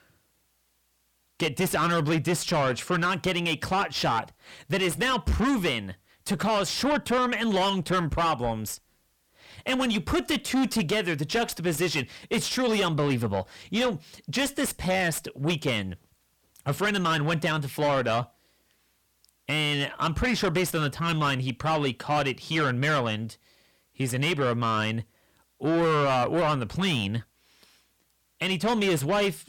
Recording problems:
distortion; heavy; 6 dB below the speech

